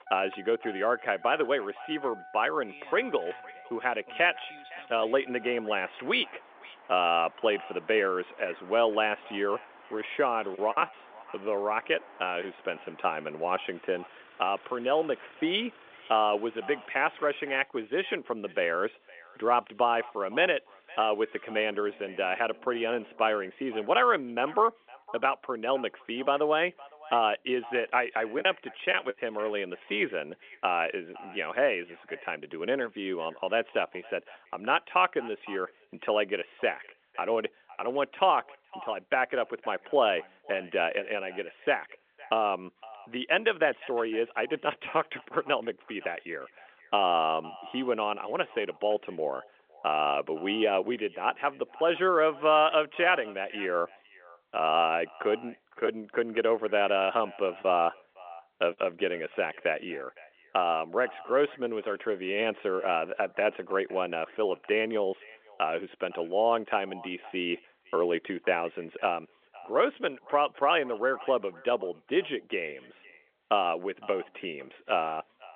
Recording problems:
echo of what is said; faint; throughout; 510 ms later, 20 dB below the speech
phone-call audio; nothing above 3 kHz
traffic noise; faint; until 24 s; 20 dB below the speech
choppy; occasionally; at 11 s, from 28 to 30 s and from 56 to 59 s; 3% of the speech affected

